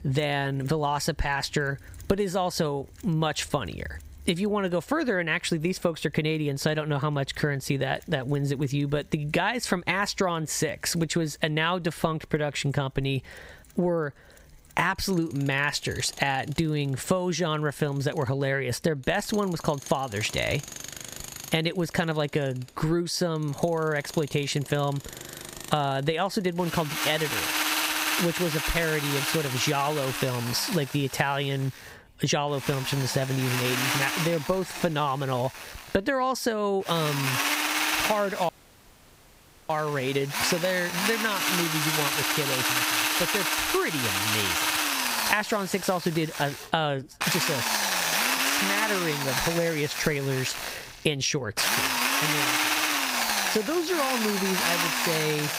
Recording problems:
squashed, flat; somewhat, background pumping
machinery noise; very loud; throughout; 1 dB above the speech
audio cutting out; at 38 s for 1 s

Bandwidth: 15.5 kHz